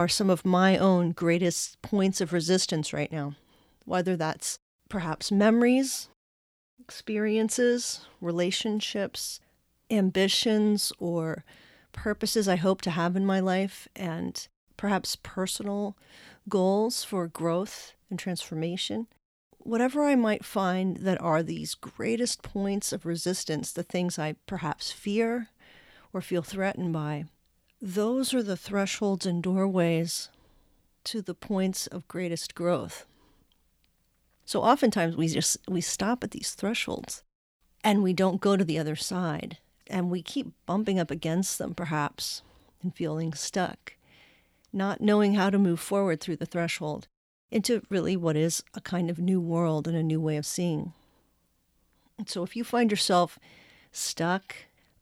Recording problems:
abrupt cut into speech; at the start

